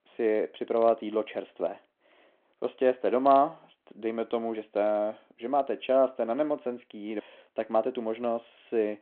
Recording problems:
phone-call audio

